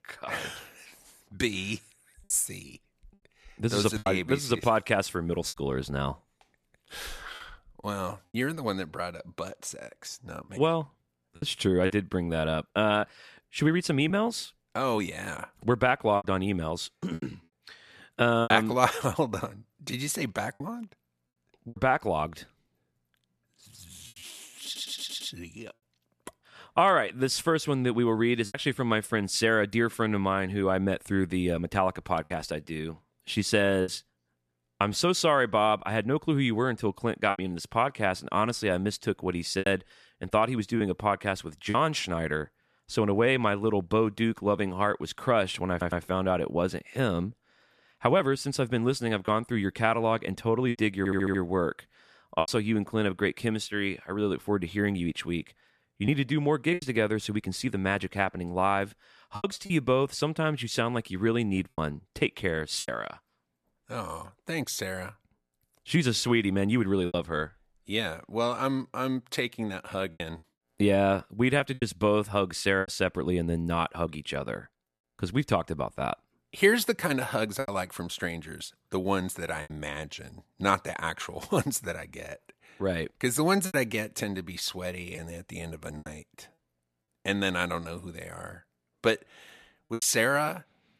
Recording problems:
choppy; occasionally; 4% of the speech affected
audio stuttering; at 25 s, at 46 s and at 51 s

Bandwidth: 13.5 kHz